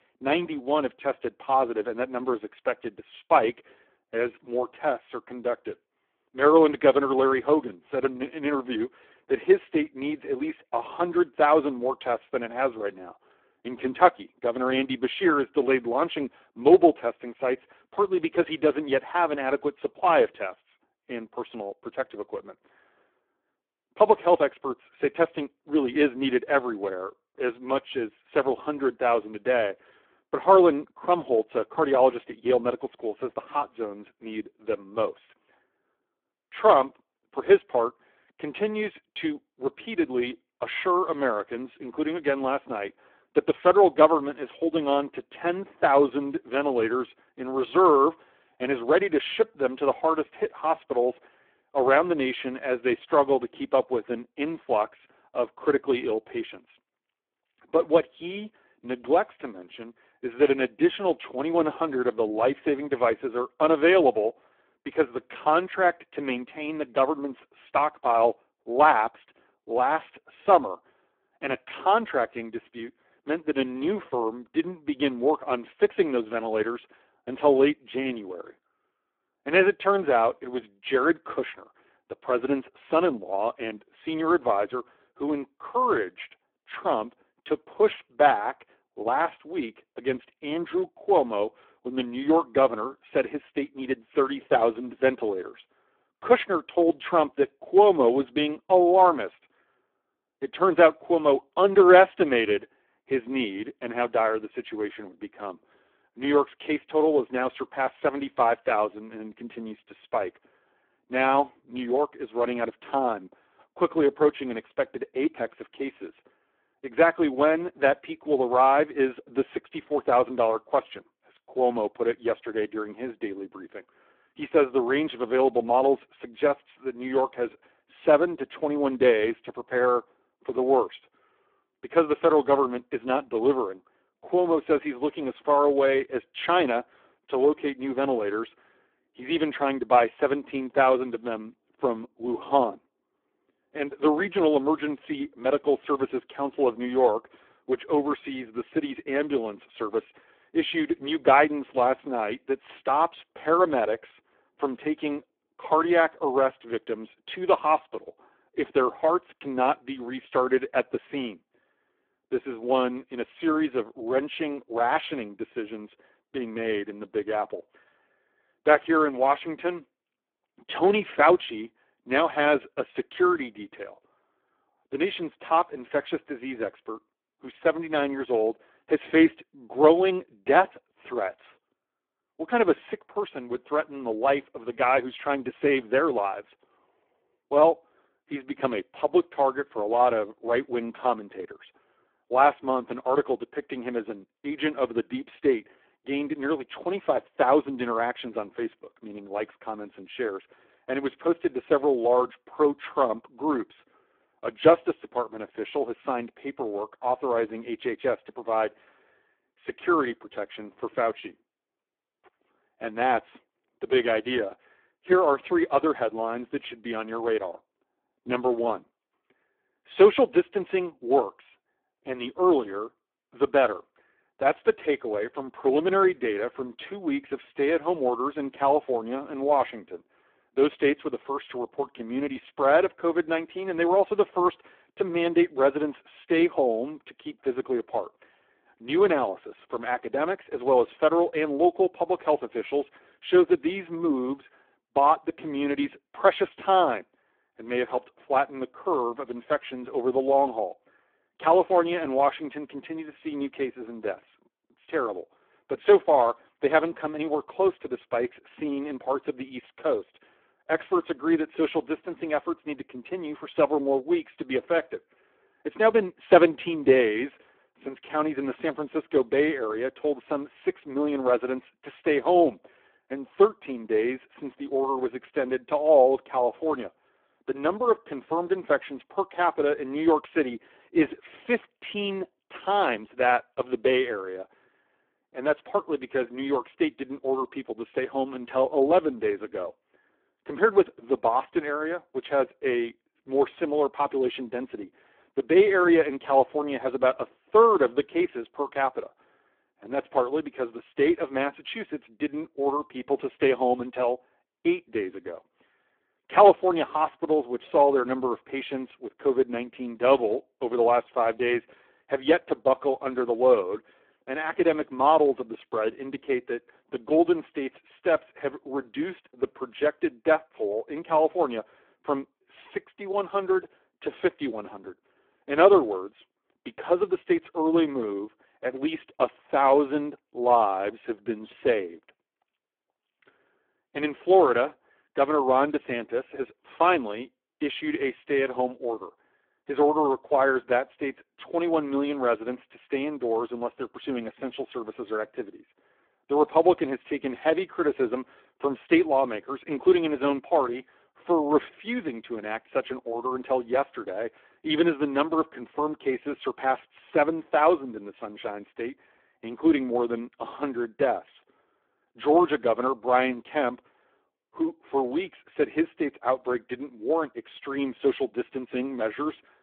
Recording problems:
phone-call audio; poor line

